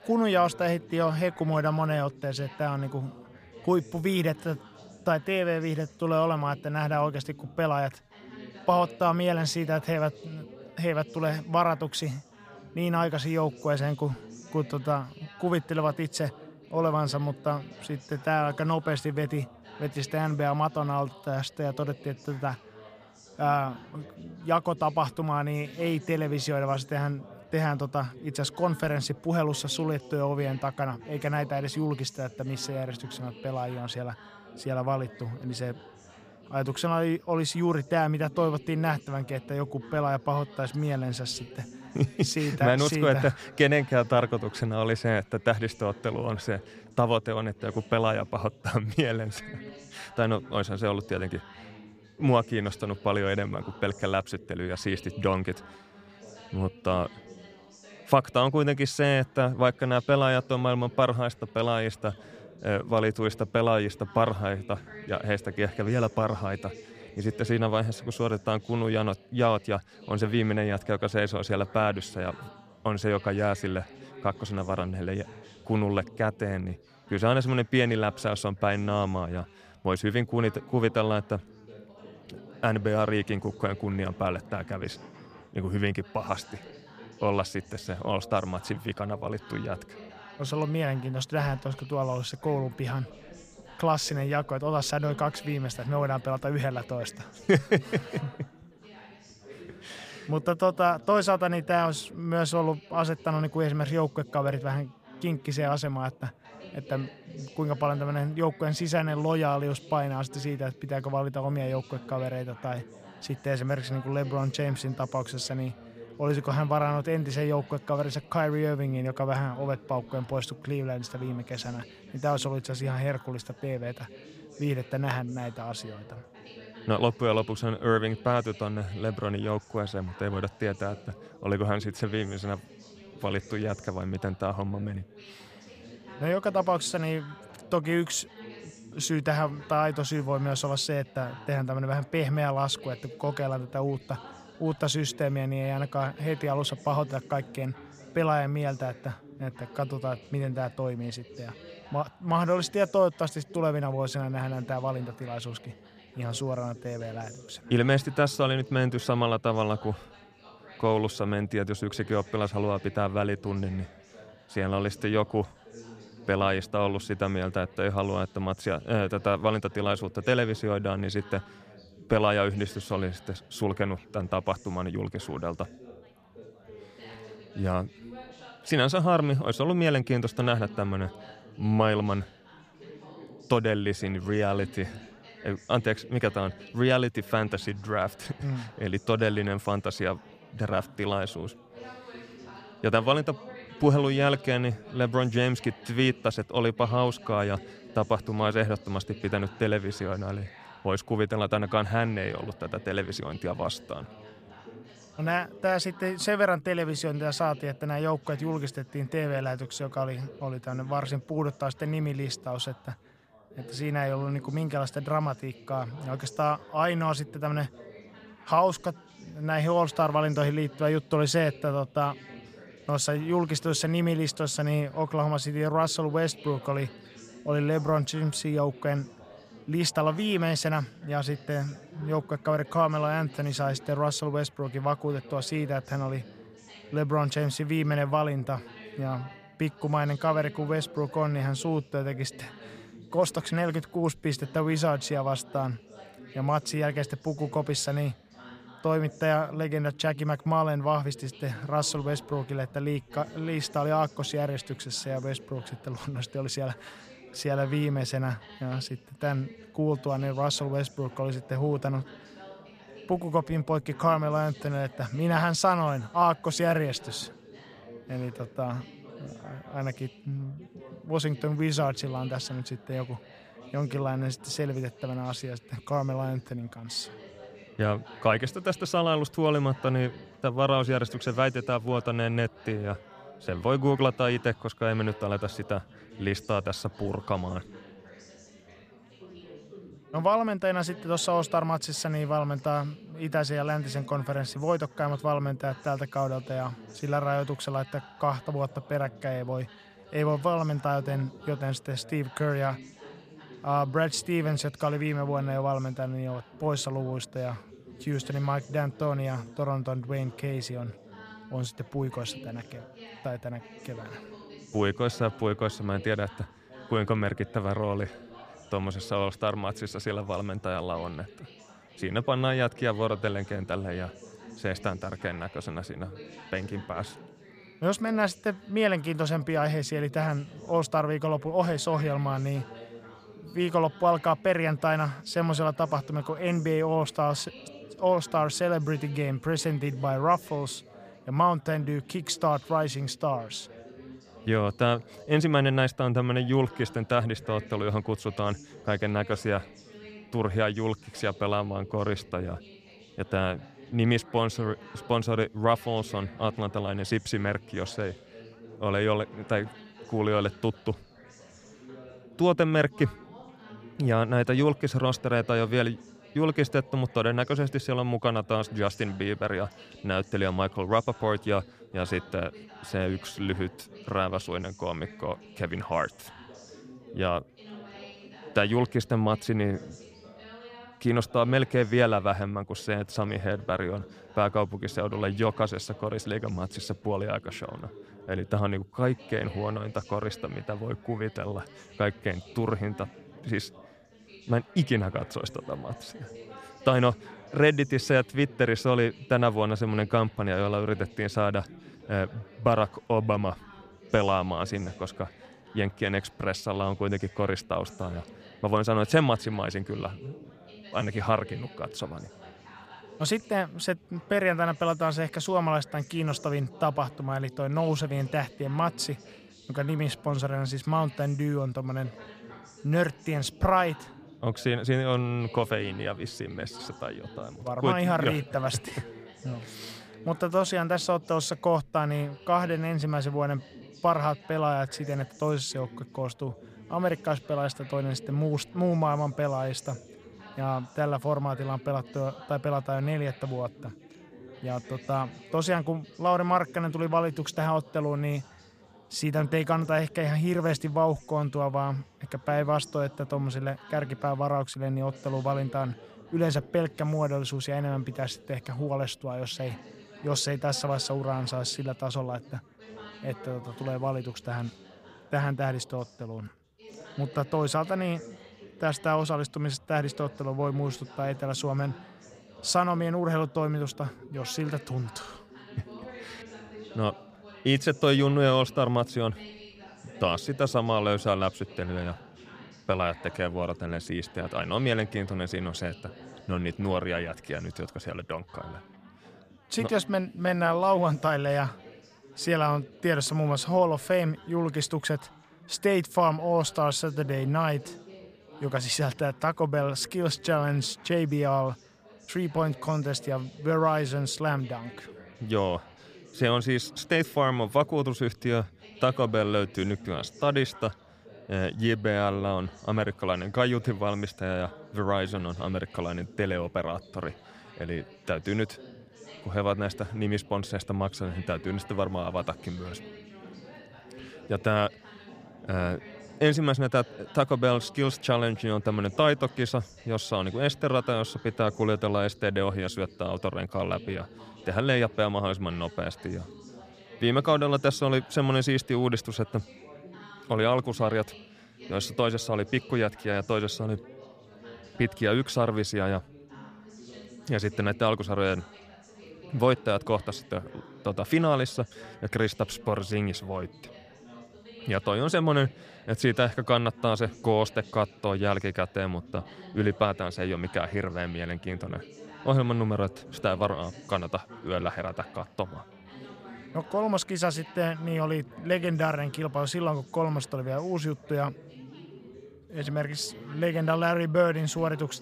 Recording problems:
background chatter; noticeable; throughout; 4 voices, 20 dB below the speech

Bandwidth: 15 kHz